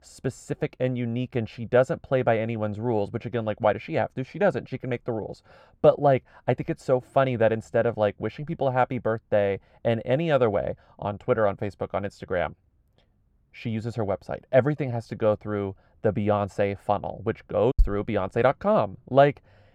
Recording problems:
muffled; very; fading above 2.5 kHz

